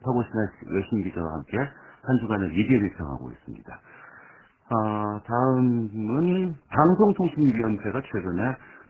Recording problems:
garbled, watery; badly; nothing above 7.5 kHz

